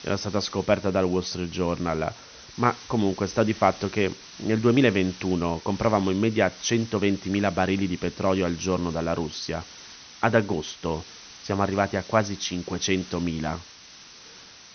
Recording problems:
high frequencies cut off; noticeable; nothing above 6 kHz
hiss; noticeable; throughout; 15 dB below the speech

